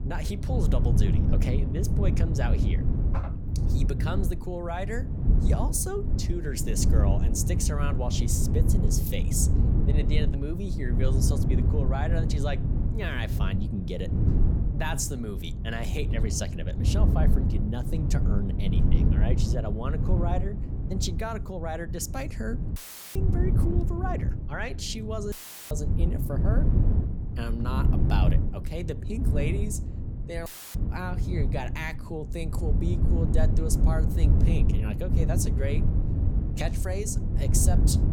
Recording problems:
wind noise on the microphone; heavy; 4 dB below the speech
audio cutting out; filled with static; at 23 s, at 25 s and at 30 s

